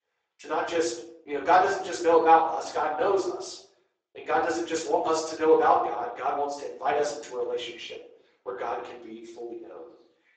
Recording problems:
off-mic speech; far
garbled, watery; badly; nothing above 8 kHz
room echo; noticeable; dies away in 0.6 s
thin; somewhat; fading below 300 Hz

